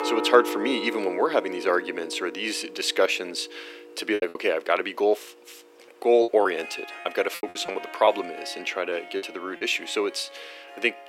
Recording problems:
thin; very; fading below 350 Hz
background music; noticeable; throughout; 10 dB below the speech
choppy; very; at 4 s and from 6 to 9.5 s; 11% of the speech affected

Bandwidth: 16 kHz